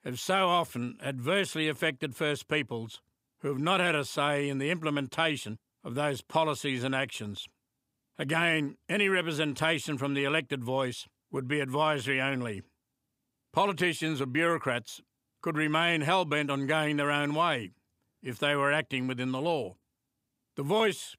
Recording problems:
none

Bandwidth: 15.5 kHz